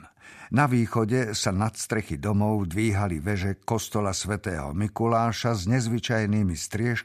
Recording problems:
none

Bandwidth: 14.5 kHz